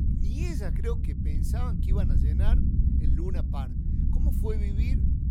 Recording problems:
low rumble; loud; throughout; as loud as the speech

